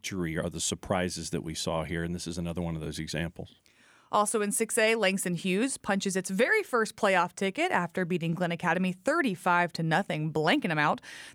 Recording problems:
none

